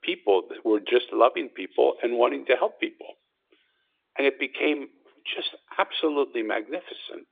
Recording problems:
phone-call audio

